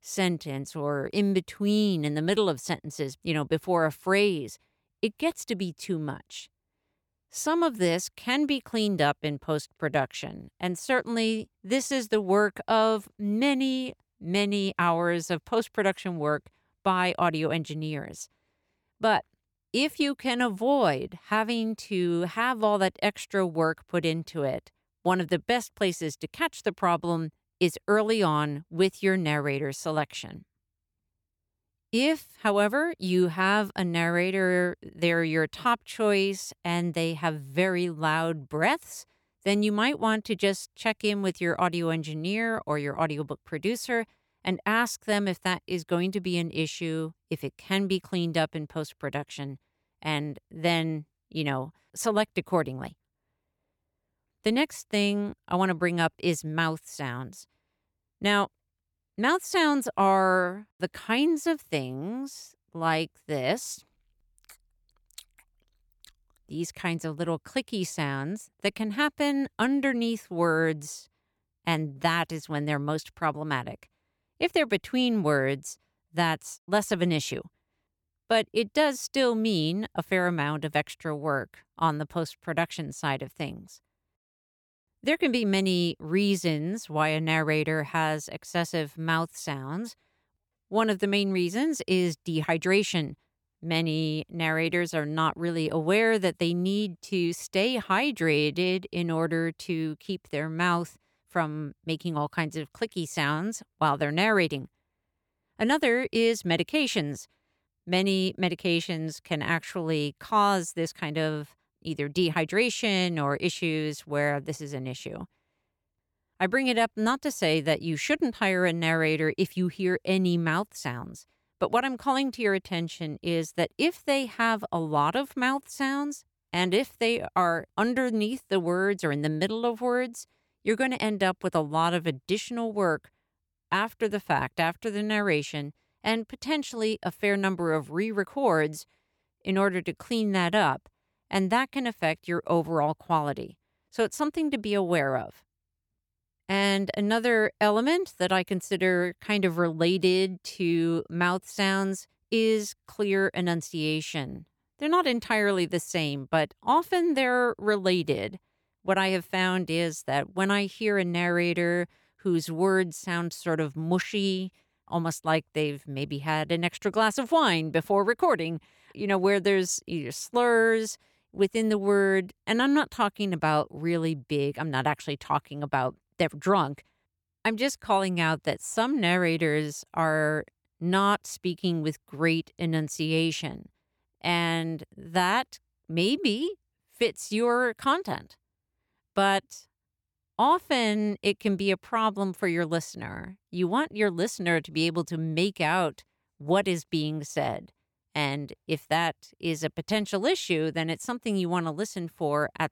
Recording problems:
none

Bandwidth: 18.5 kHz